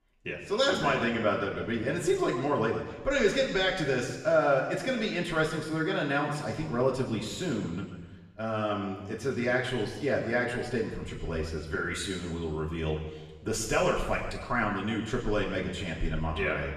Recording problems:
off-mic speech; far
room echo; noticeable; dies away in 1.2 s

